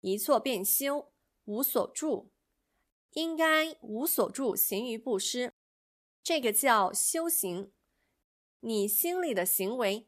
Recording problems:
none

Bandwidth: 14.5 kHz